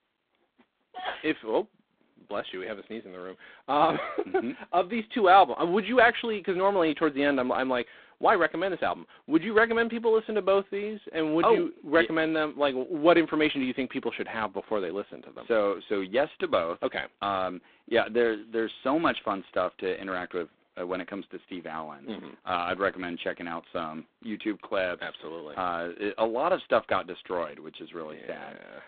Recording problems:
phone-call audio; poor line; nothing above 3.5 kHz

